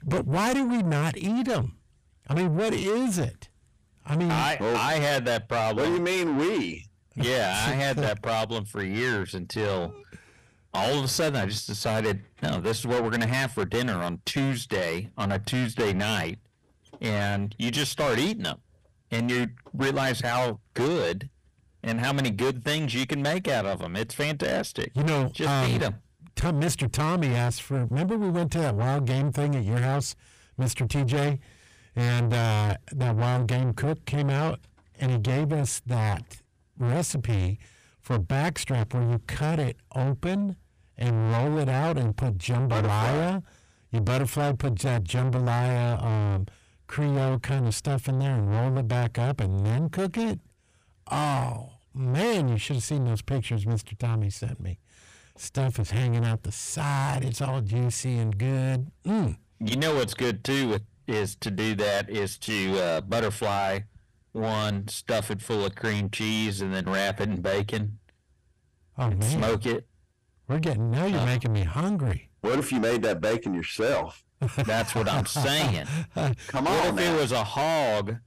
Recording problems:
distortion; heavy; 6 dB below the speech

